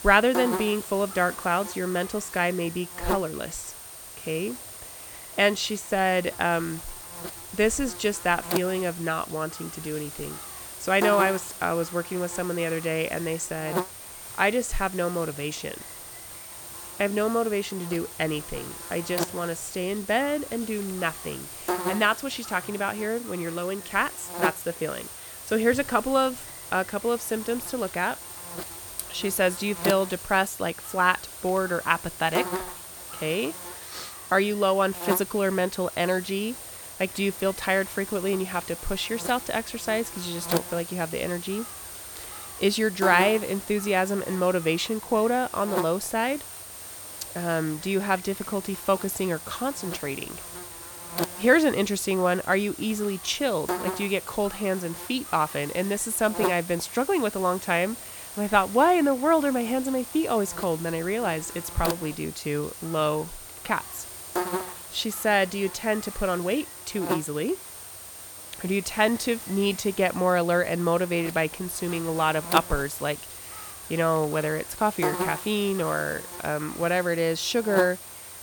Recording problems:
electrical hum; noticeable; throughout; 60 Hz, 10 dB below the speech

